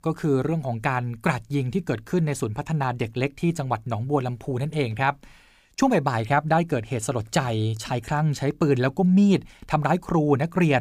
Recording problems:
abrupt cut into speech; at the end

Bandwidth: 15 kHz